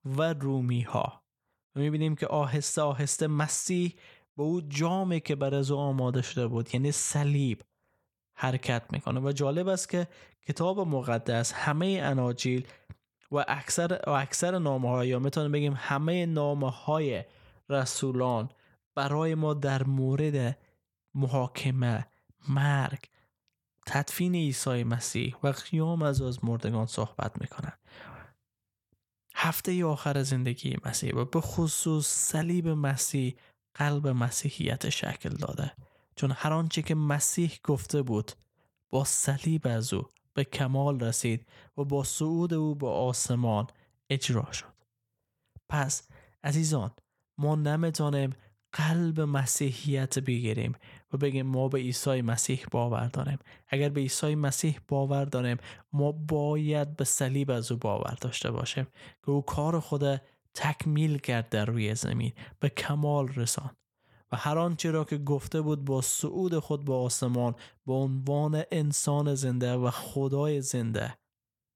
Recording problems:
none

